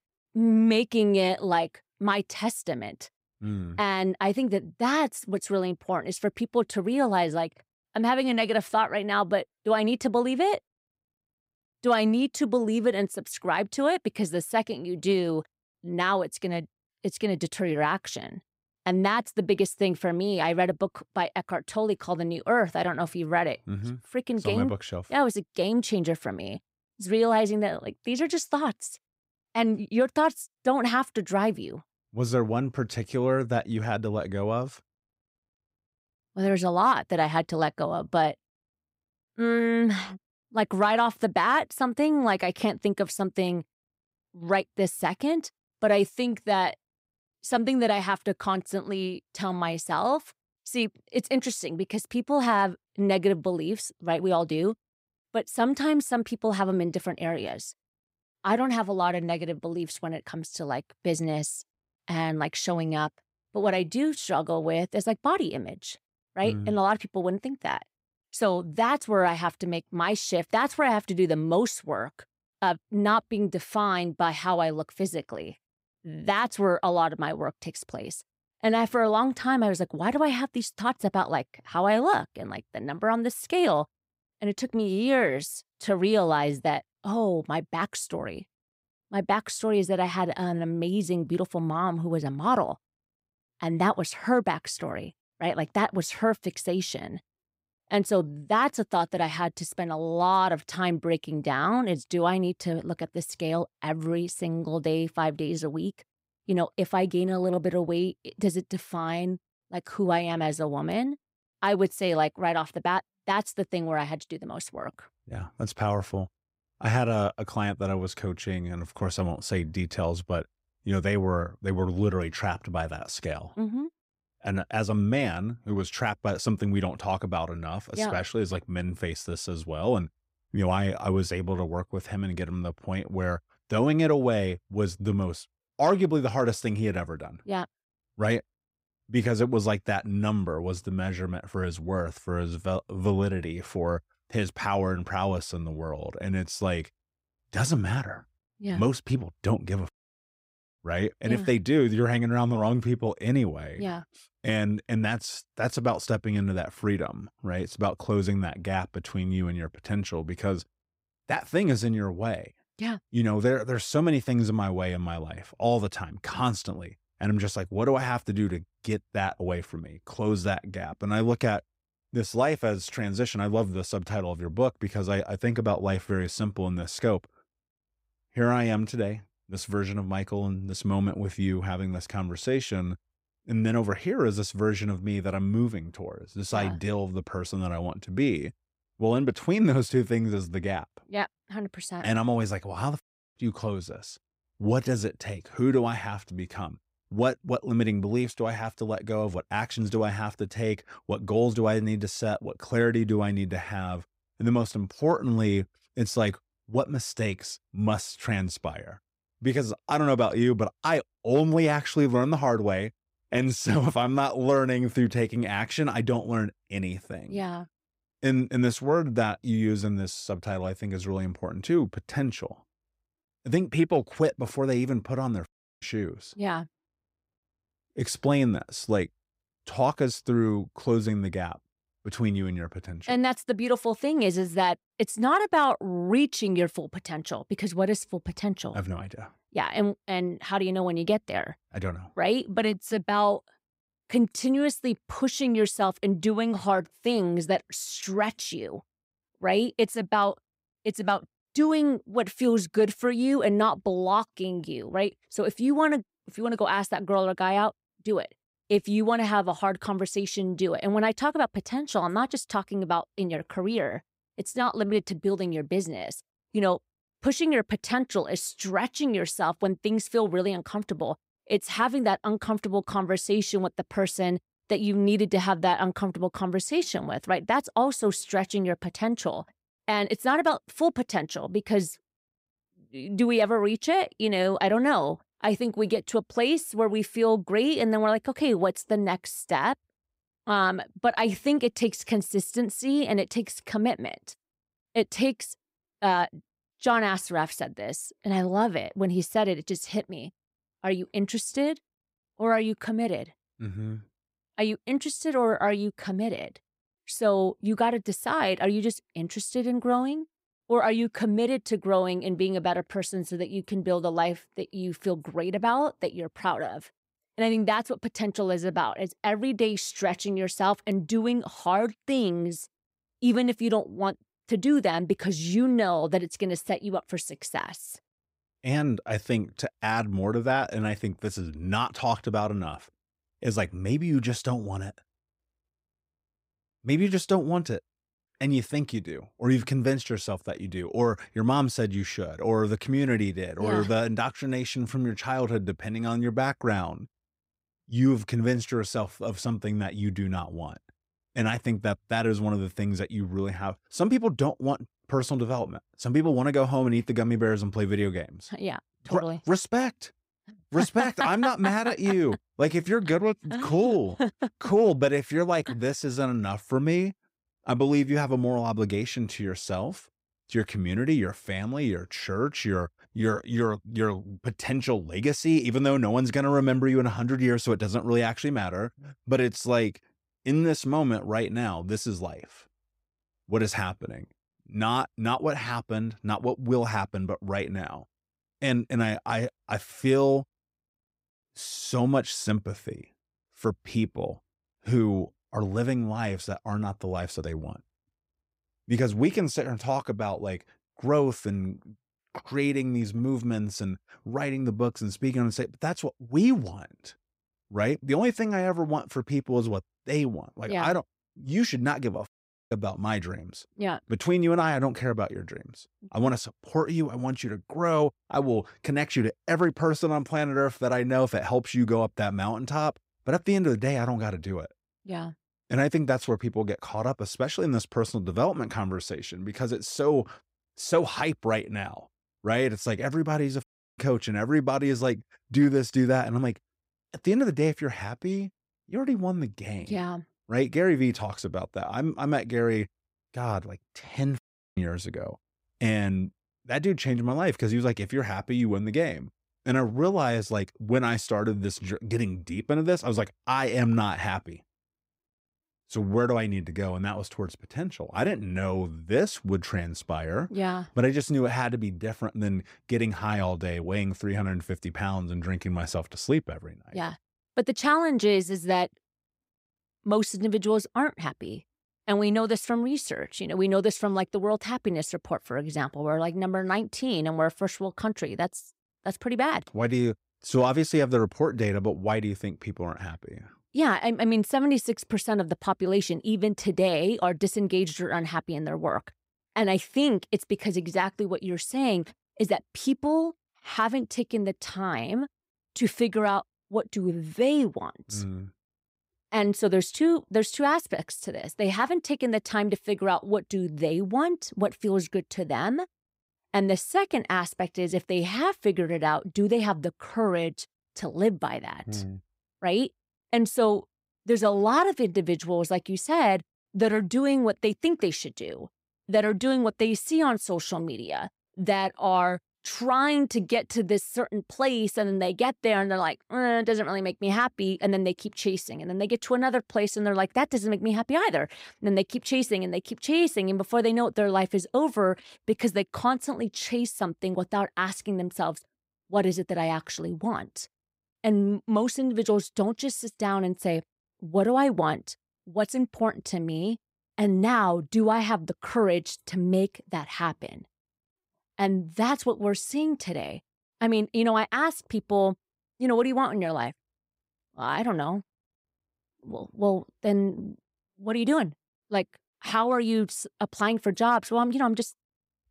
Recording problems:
none

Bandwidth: 15.5 kHz